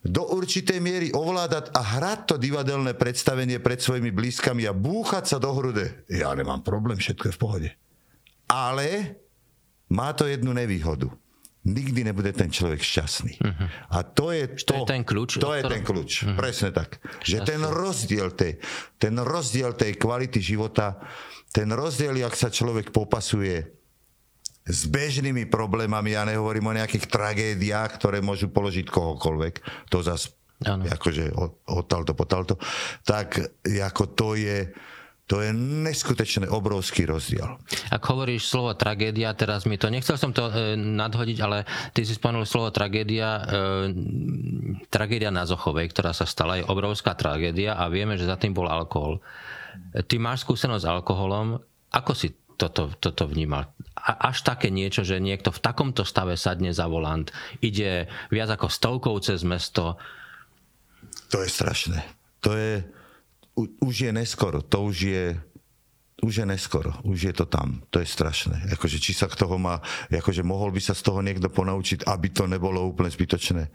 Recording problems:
squashed, flat; somewhat

